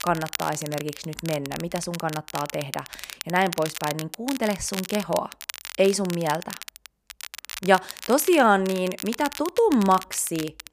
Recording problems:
crackle, like an old record; noticeable; 10 dB below the speech

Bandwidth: 15 kHz